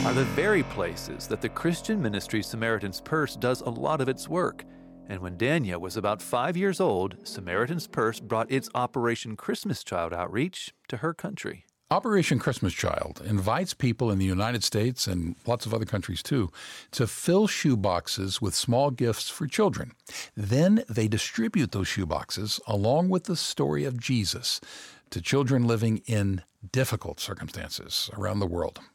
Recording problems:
background music; noticeable; until 8.5 s; 15 dB below the speech

